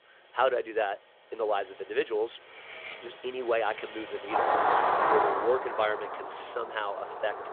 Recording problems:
phone-call audio; nothing above 3.5 kHz
traffic noise; very loud; throughout; 2 dB above the speech
clattering dishes; faint; at 2.5 s; peak 10 dB below the speech

